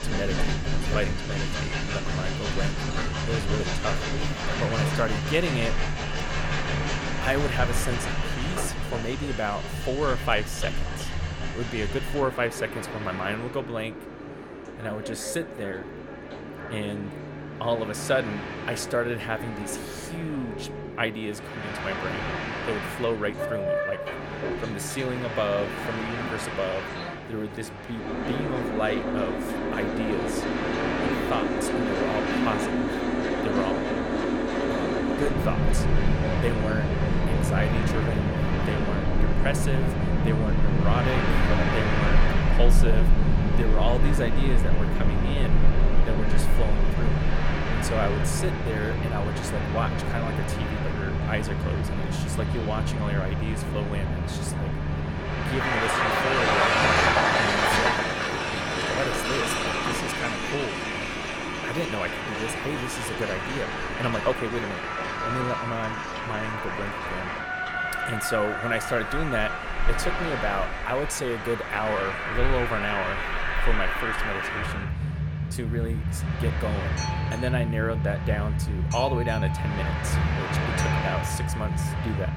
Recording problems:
train or aircraft noise; very loud; throughout; 4 dB above the speech

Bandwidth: 17.5 kHz